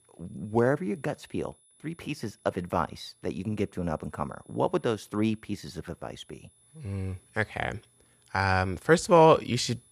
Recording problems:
high-pitched whine; faint; throughout; 10 kHz, 35 dB below the speech

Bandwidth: 14.5 kHz